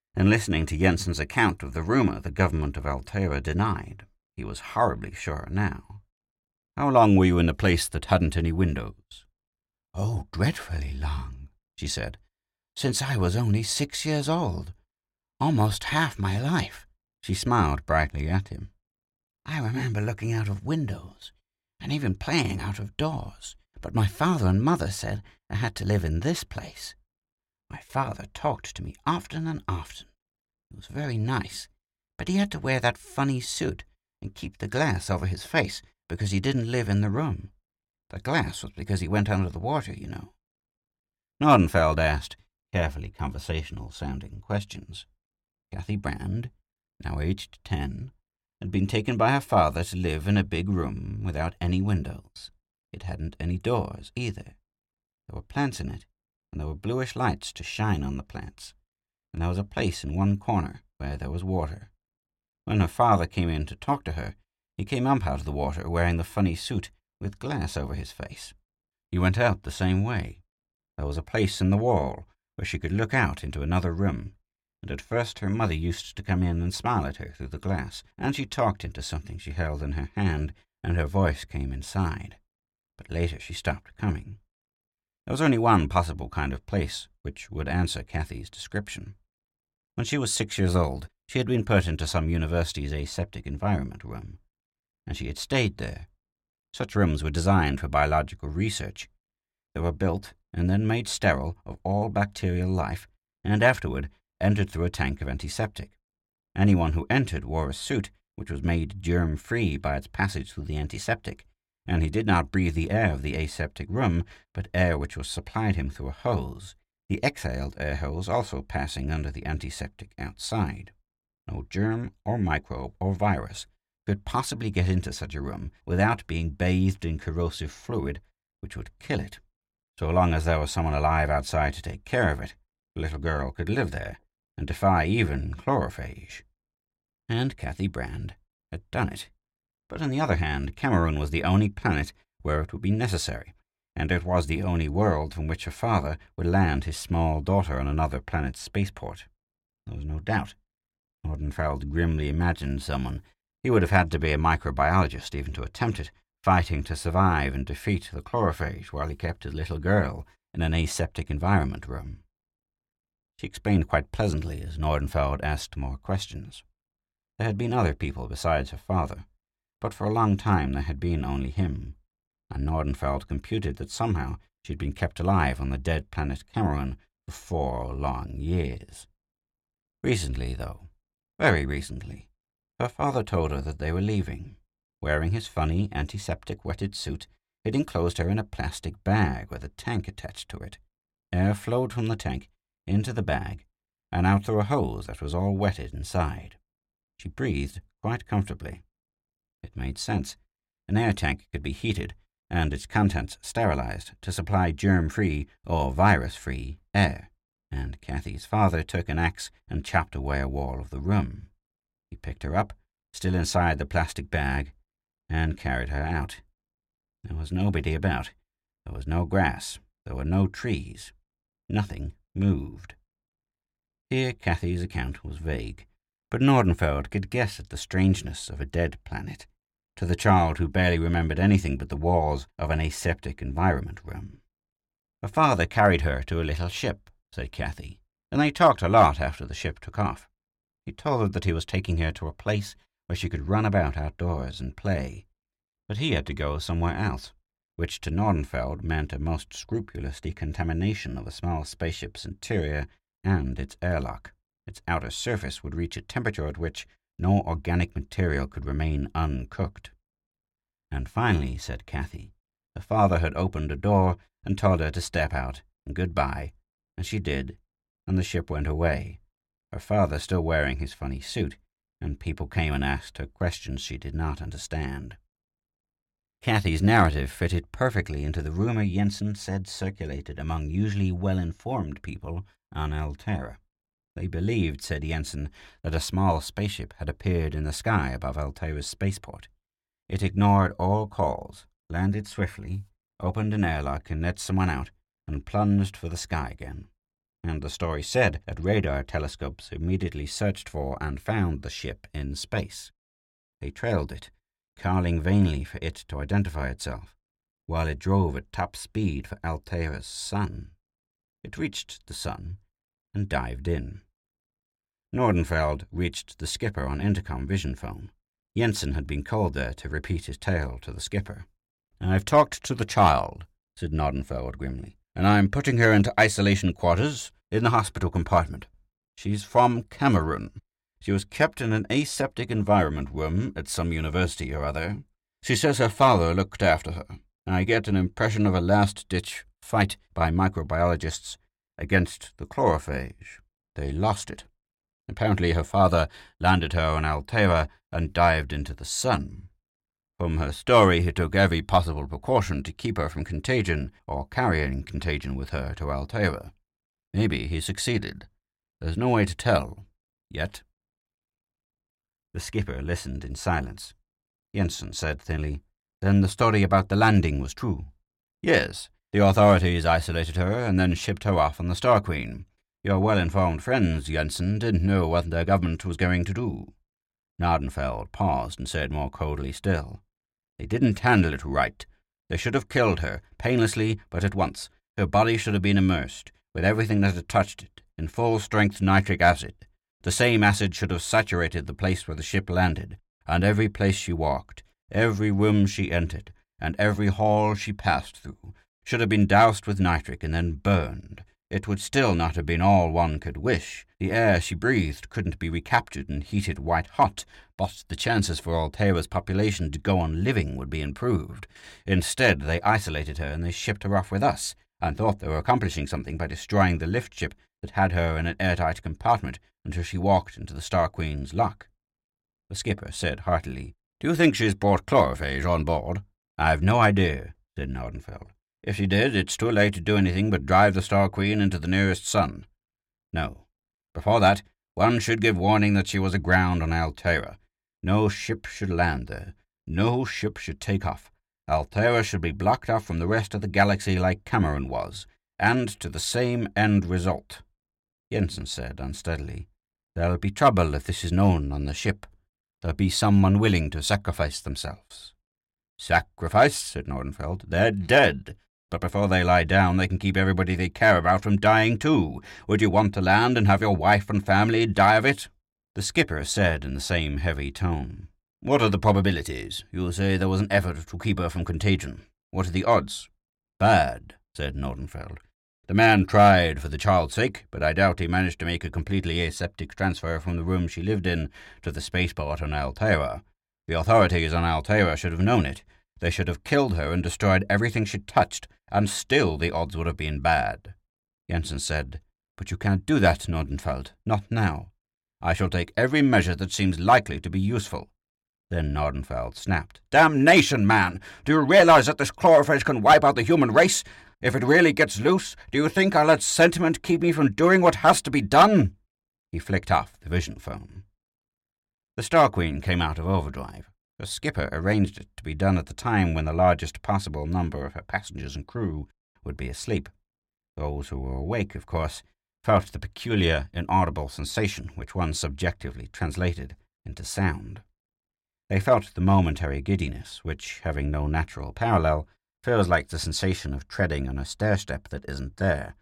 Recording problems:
none

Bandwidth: 16.5 kHz